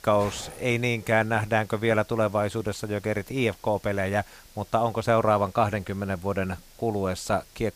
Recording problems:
hiss; faint; throughout; 25 dB below the speech

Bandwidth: 15 kHz